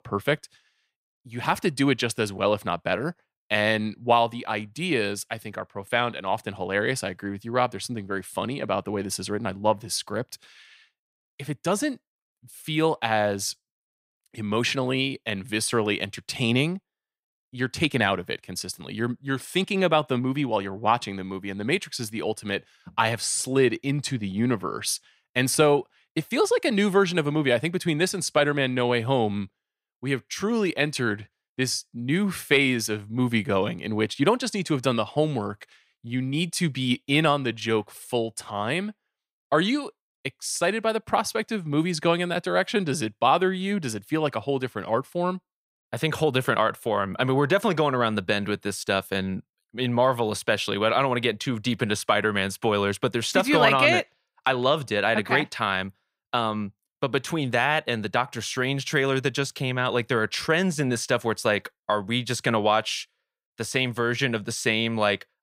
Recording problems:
none

